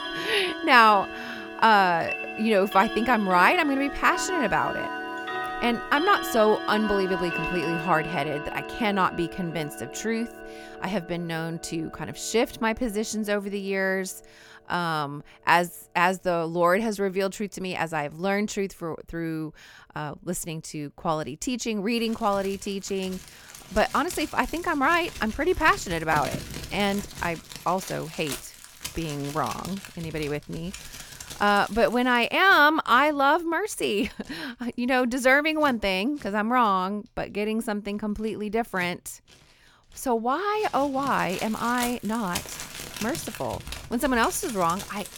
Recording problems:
household noises; noticeable; throughout; 10 dB below the speech

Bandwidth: 18 kHz